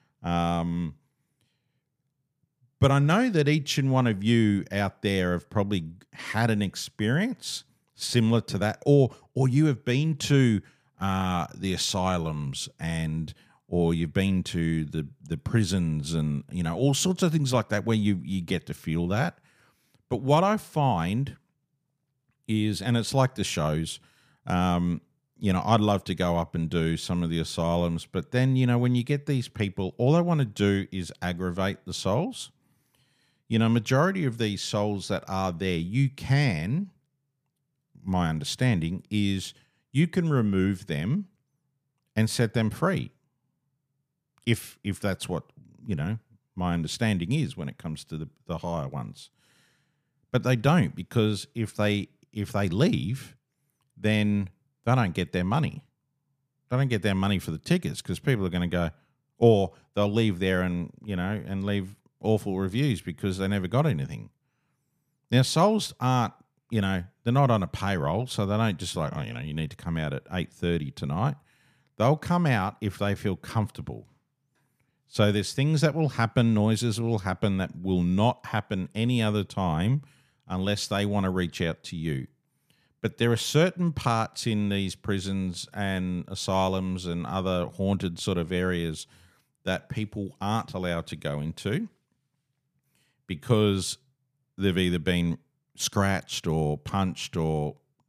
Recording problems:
none

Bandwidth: 15 kHz